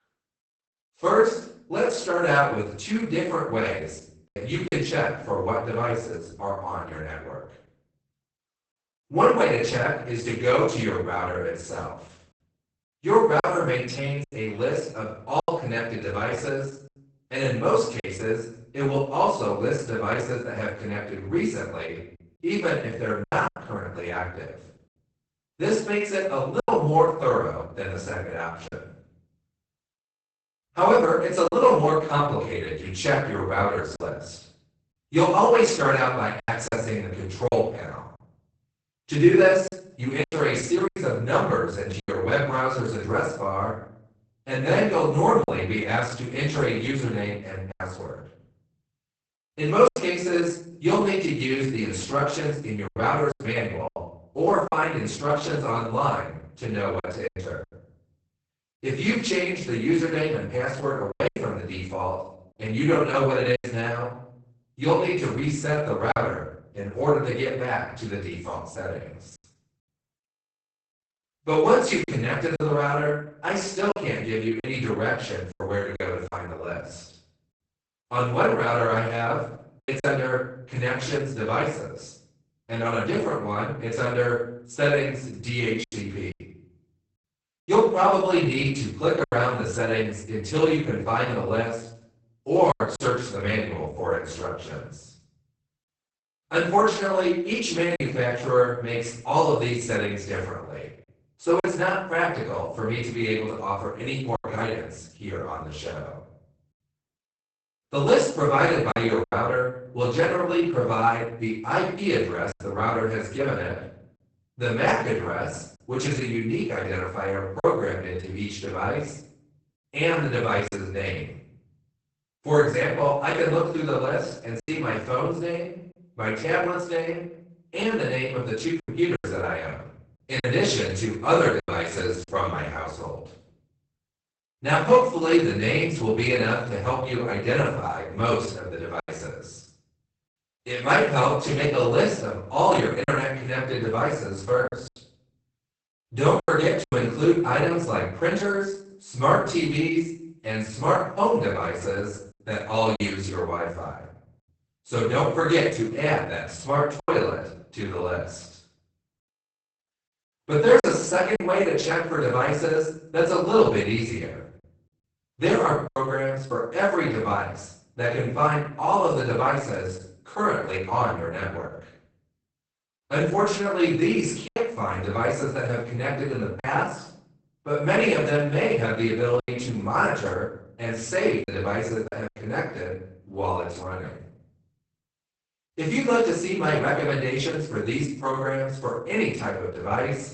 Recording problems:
off-mic speech; far
garbled, watery; badly; nothing above 8 kHz
room echo; noticeable; dies away in 0.5 s
choppy; occasionally; 3% of the speech affected

